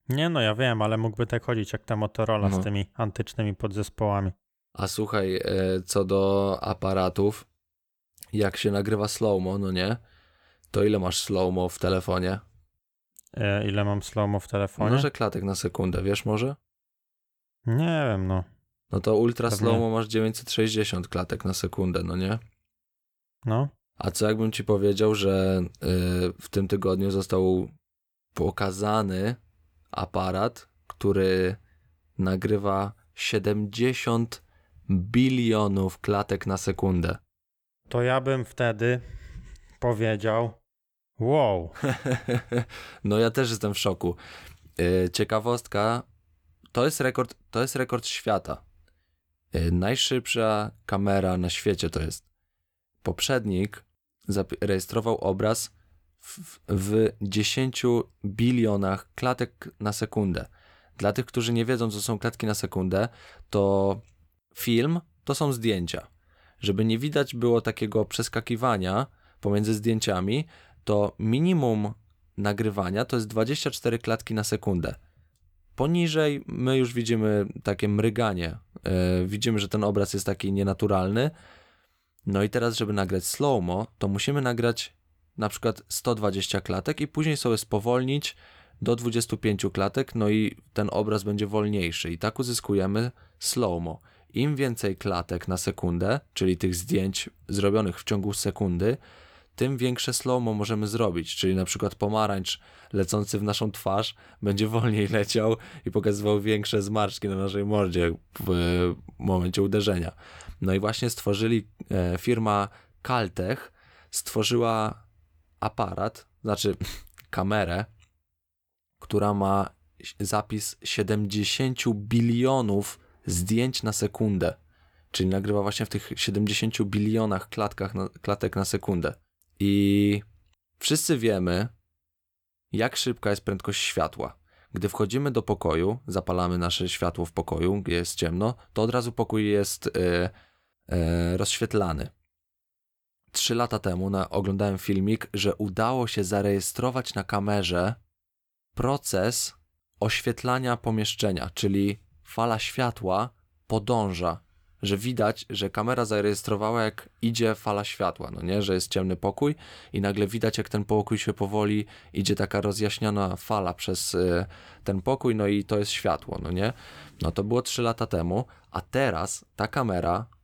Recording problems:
none

